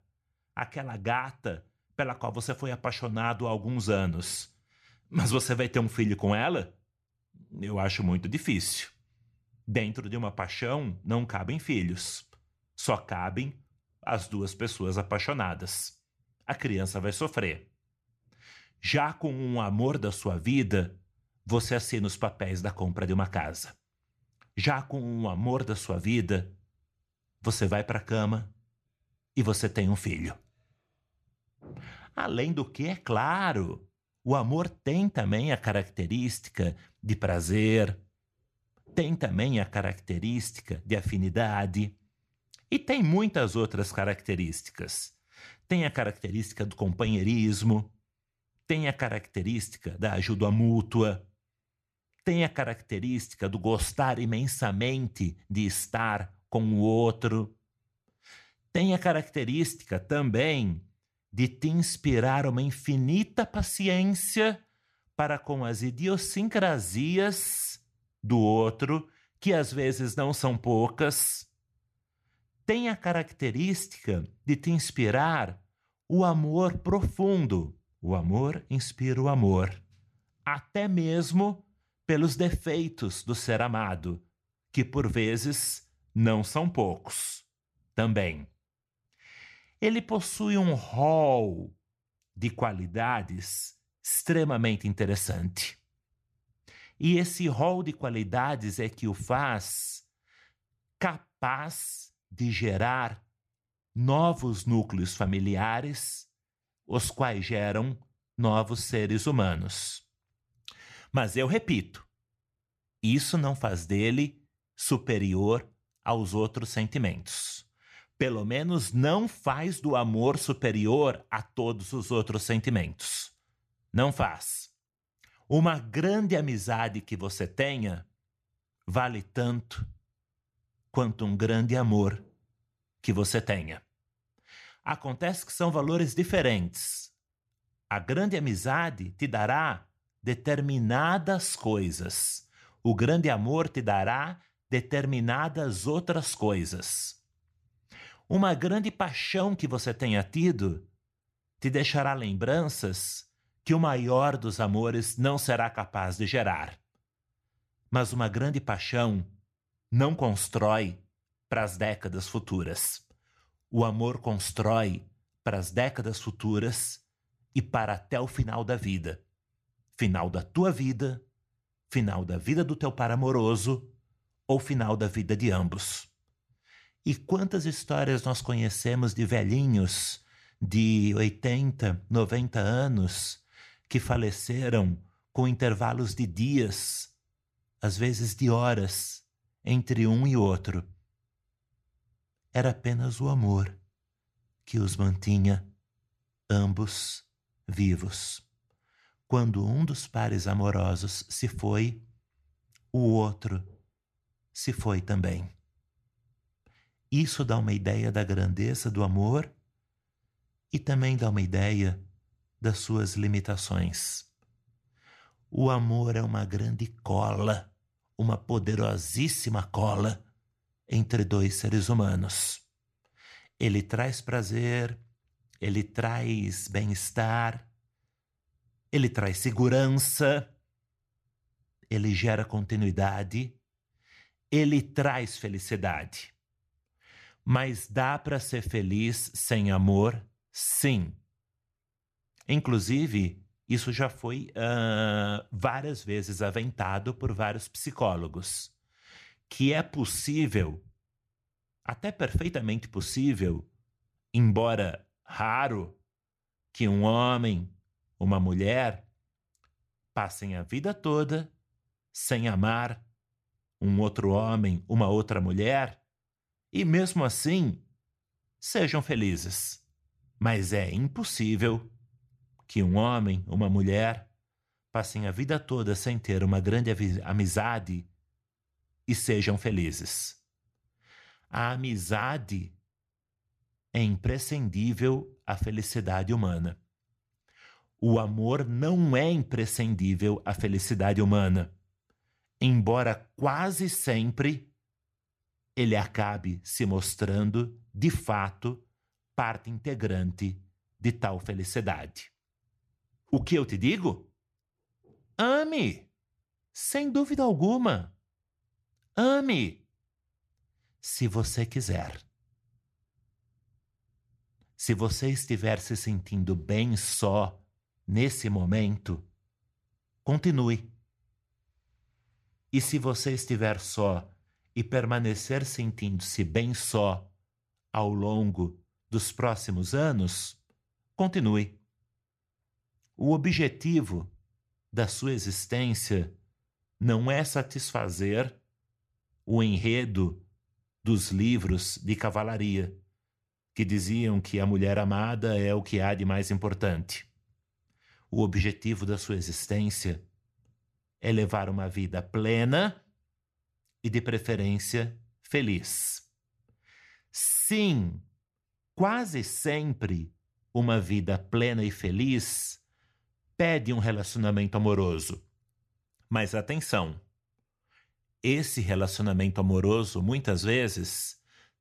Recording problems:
none

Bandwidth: 14 kHz